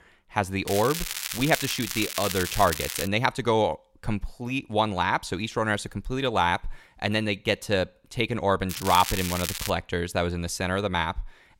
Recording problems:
crackling; loud; from 0.5 to 3 s and from 8.5 to 9.5 s; 5 dB below the speech

